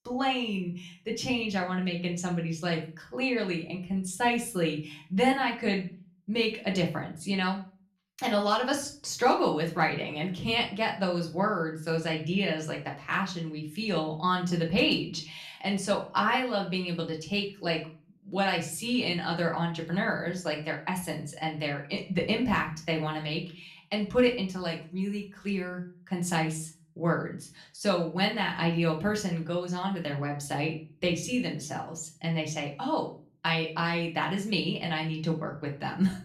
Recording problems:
off-mic speech; far
room echo; slight; dies away in 0.4 s

